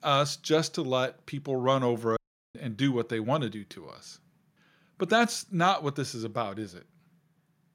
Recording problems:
audio cutting out; at 2 s

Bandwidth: 16 kHz